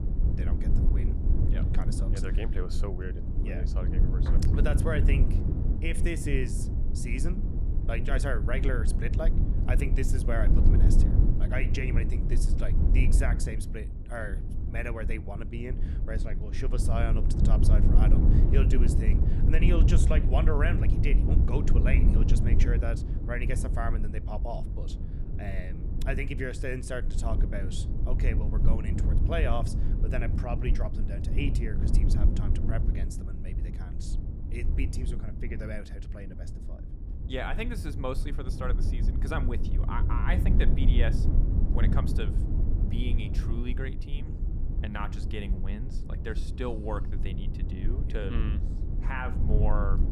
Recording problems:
low rumble; loud; throughout; 5 dB below the speech

